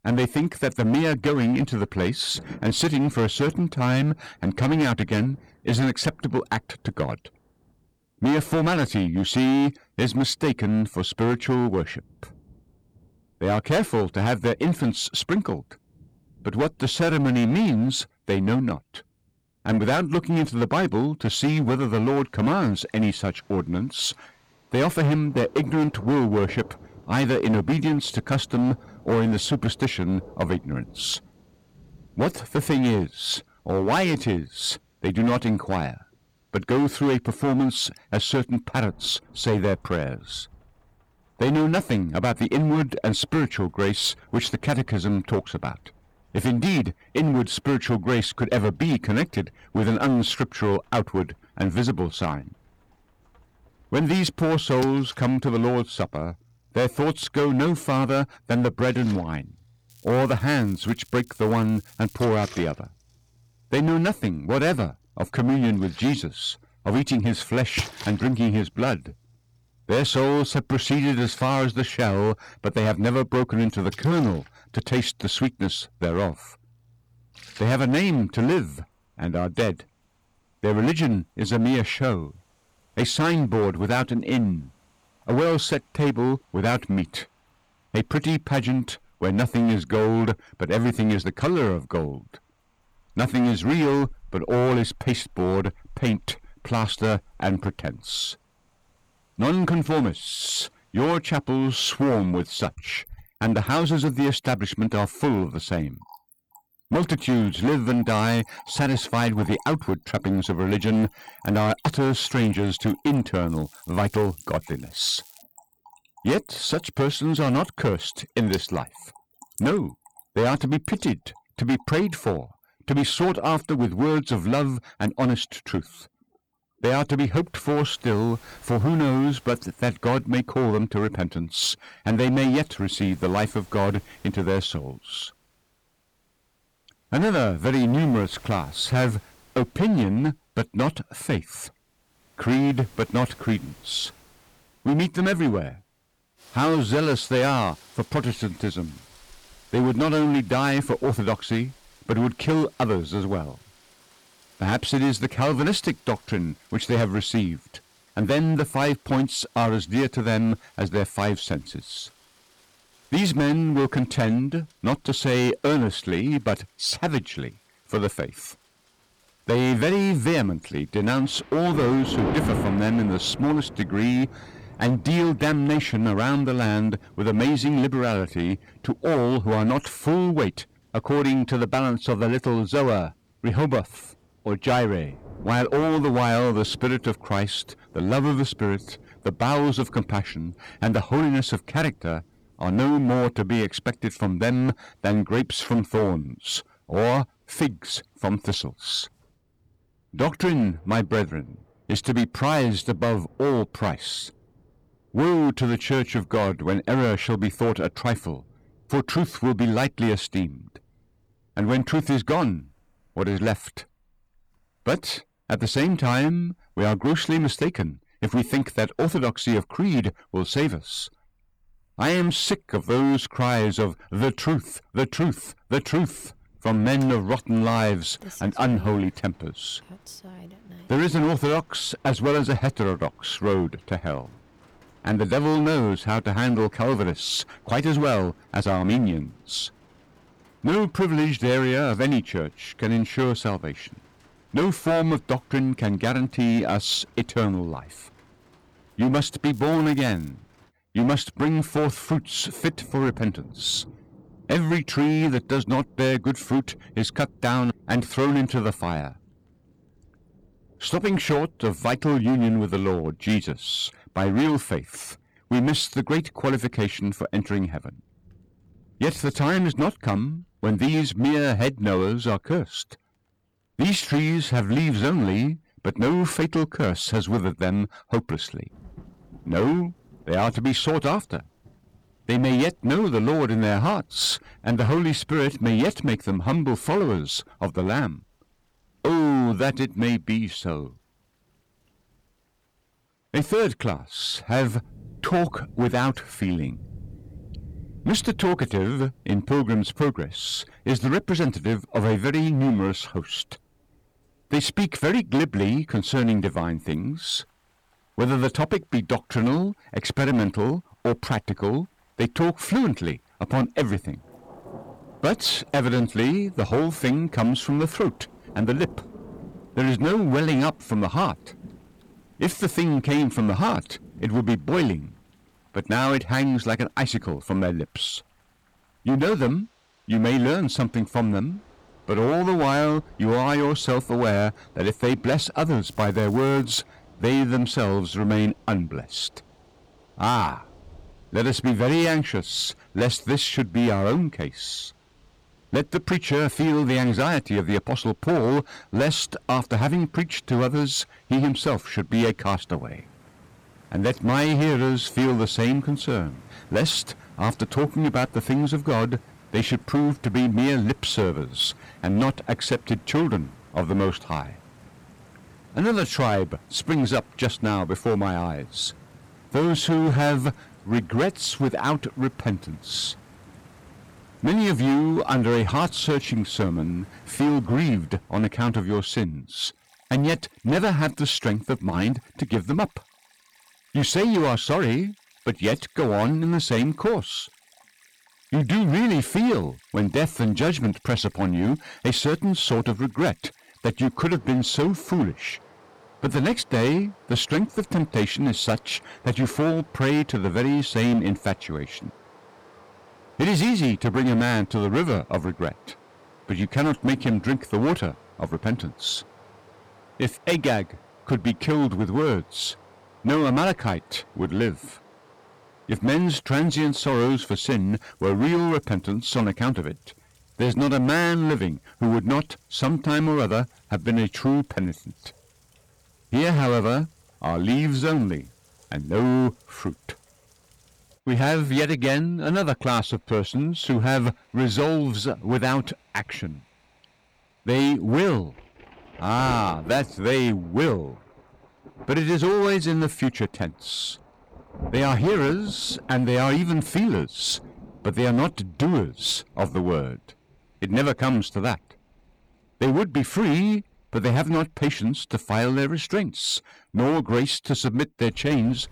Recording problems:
distortion; heavy; 12% of the sound clipped
rain or running water; faint; throughout; 20 dB below the speech
crackling; faint; 4 times, first at 1:00; 25 dB below the speech

